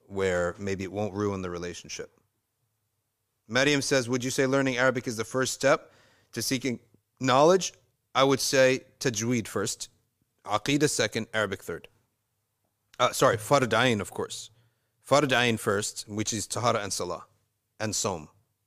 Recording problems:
none

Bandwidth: 15 kHz